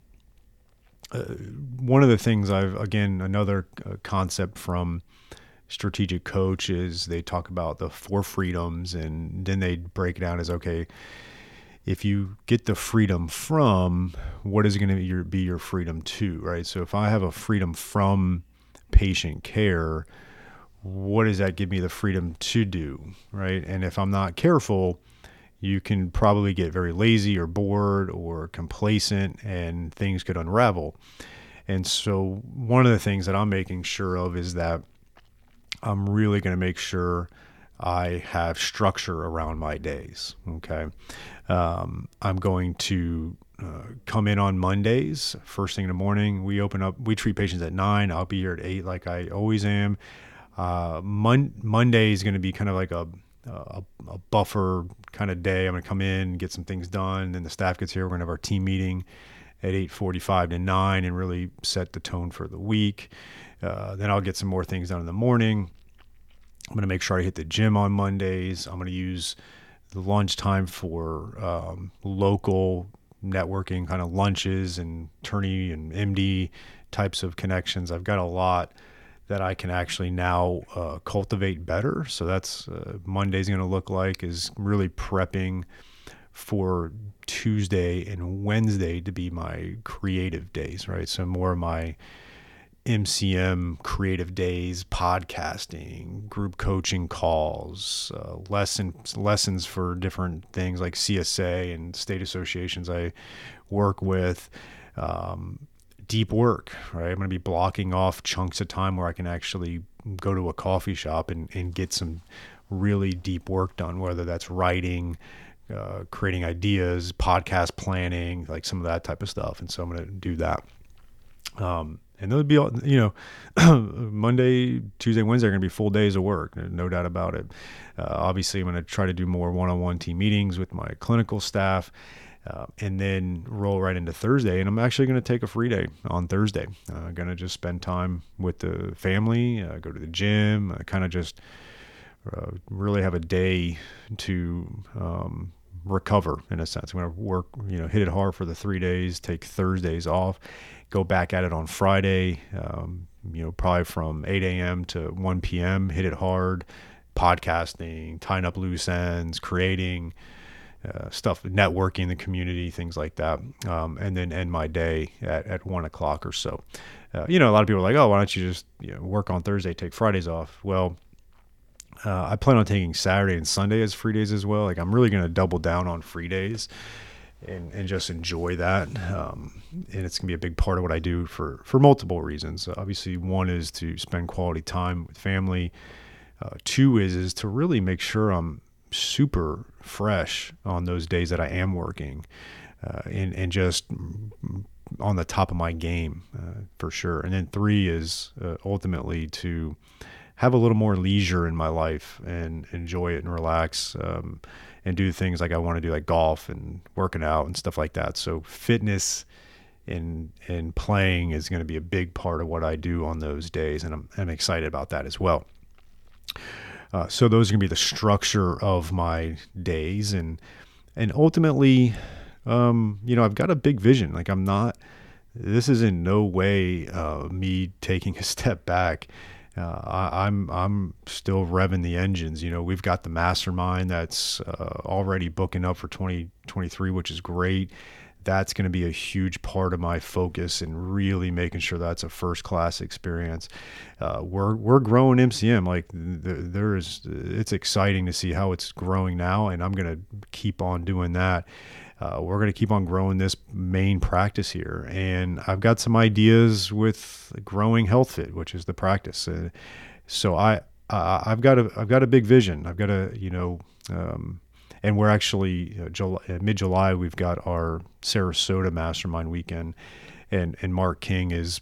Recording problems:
none

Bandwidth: 18.5 kHz